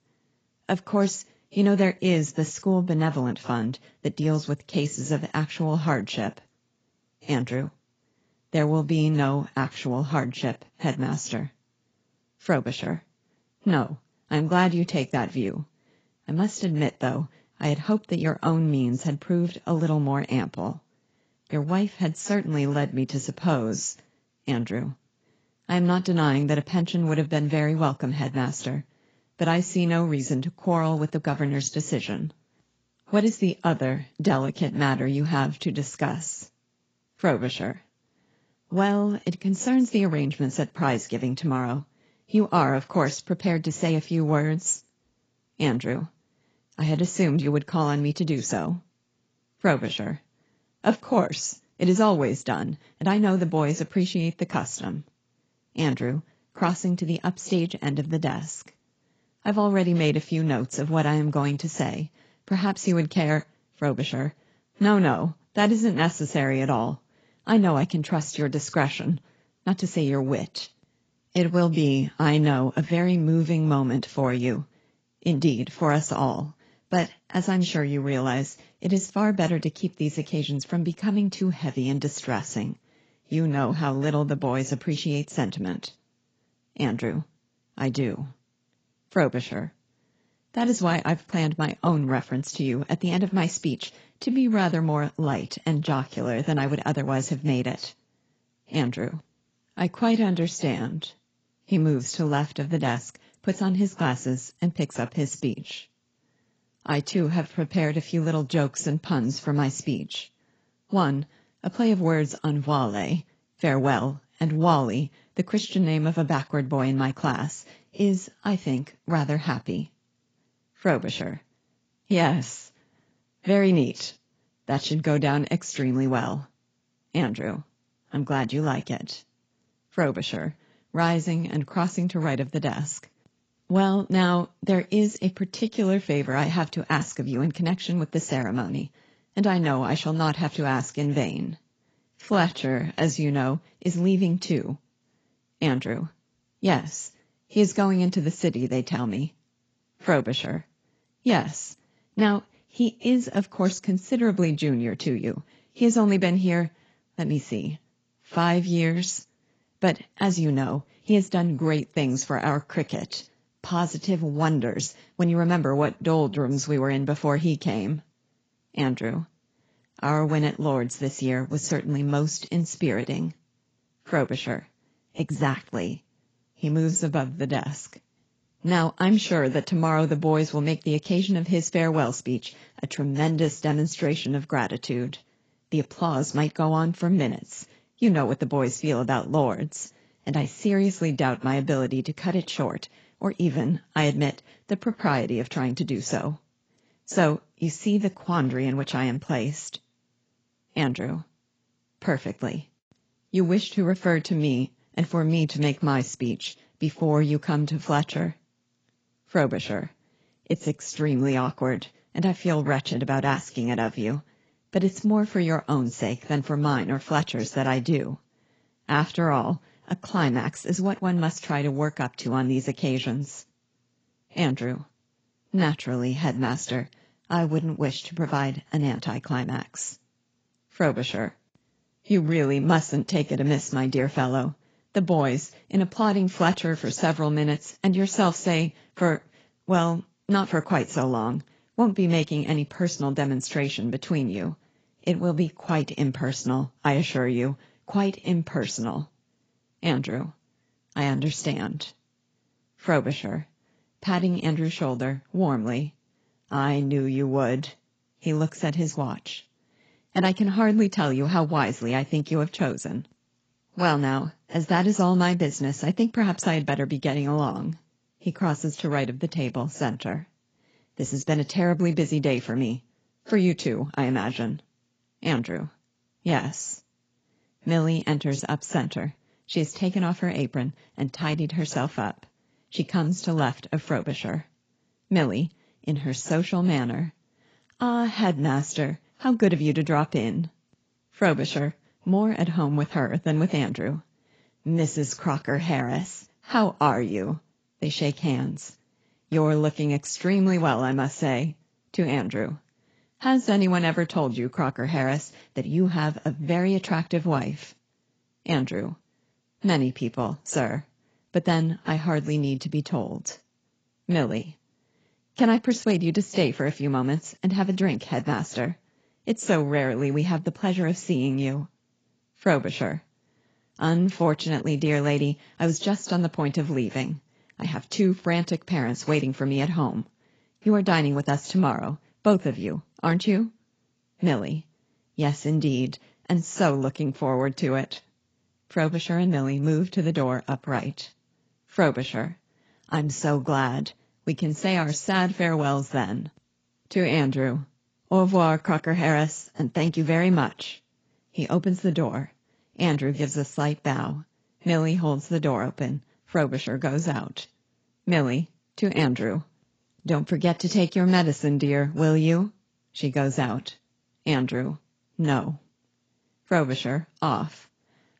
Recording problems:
garbled, watery; badly; nothing above 7.5 kHz
uneven, jittery; strongly; from 53 s to 5:45

